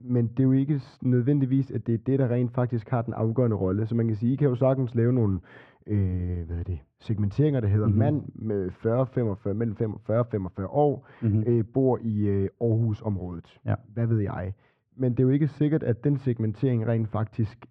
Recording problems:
muffled; very; fading above 1 kHz

